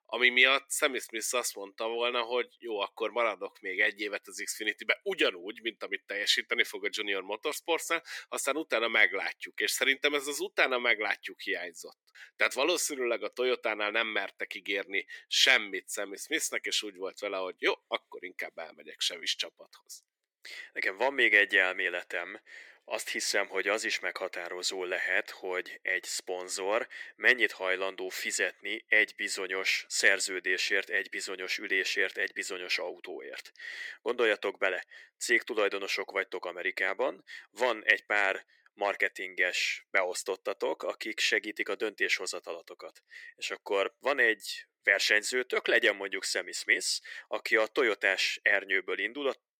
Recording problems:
thin; very; fading below 350 Hz

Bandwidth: 18 kHz